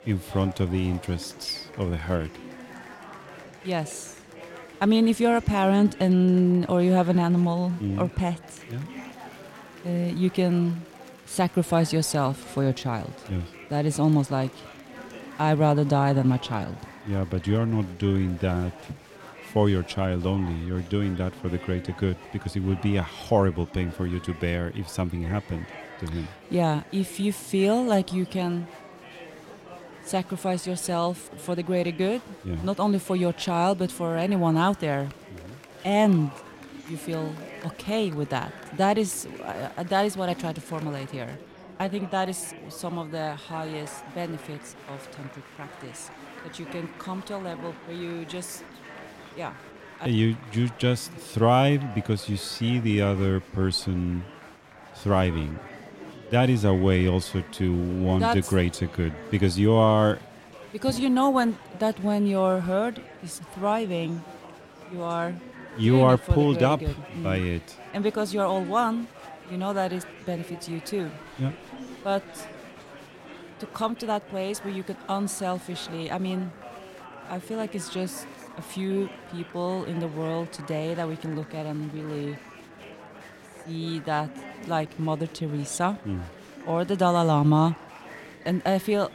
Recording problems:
murmuring crowd; noticeable; throughout; 15 dB below the speech

